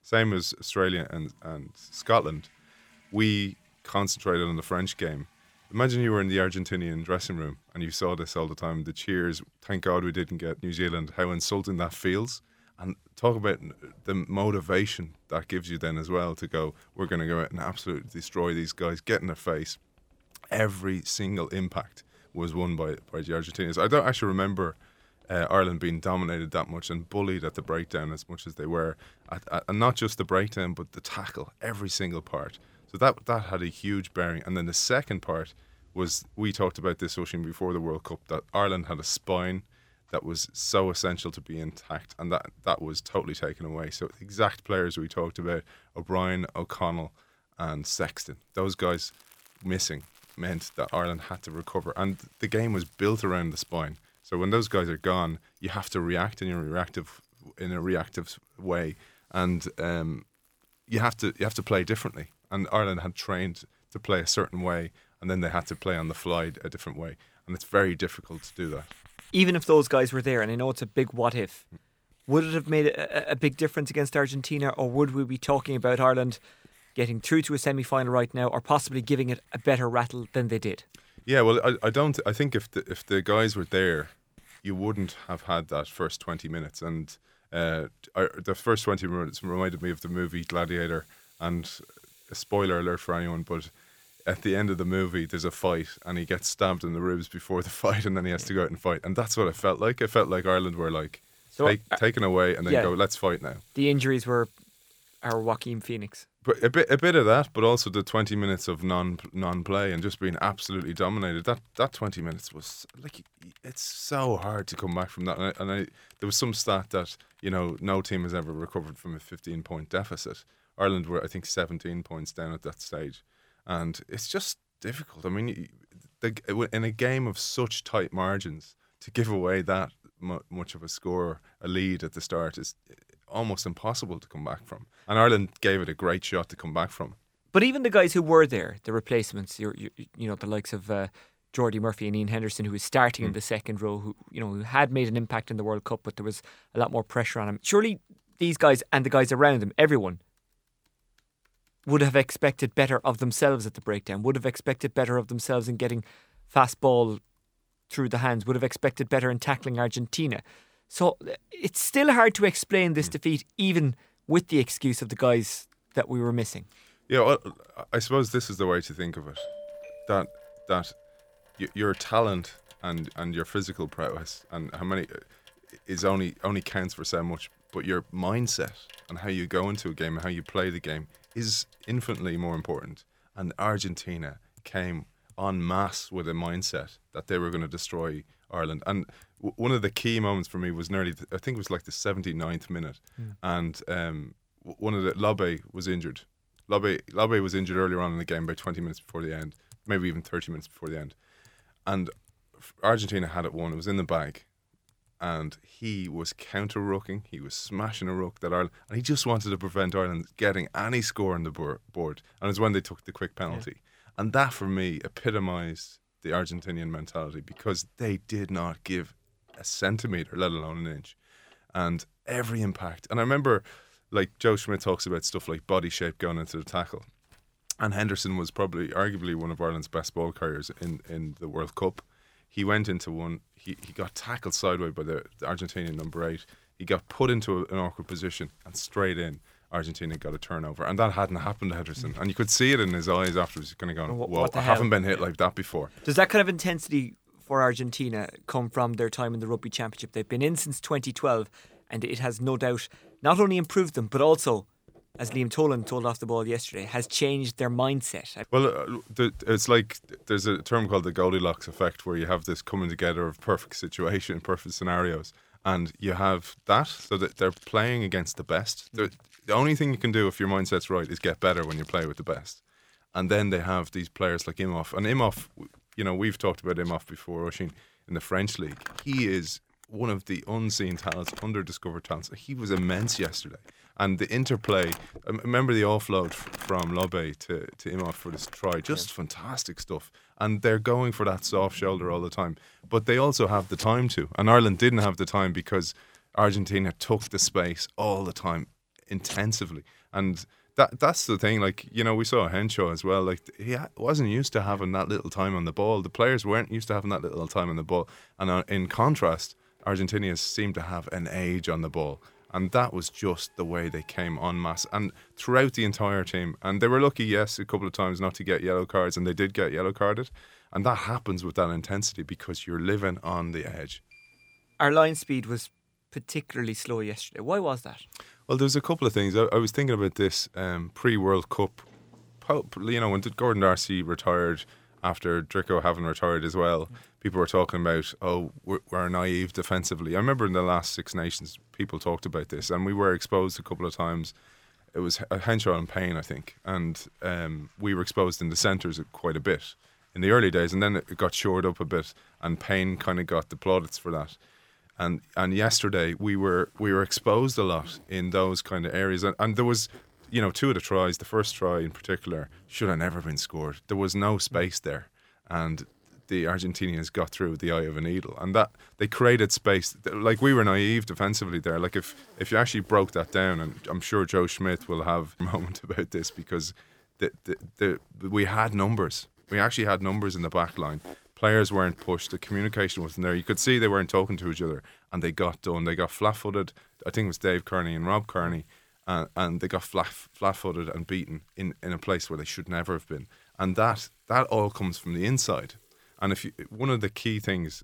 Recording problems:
household noises; faint; throughout; 25 dB below the speech
doorbell; faint; from 2:49 to 2:51; peak 10 dB below the speech

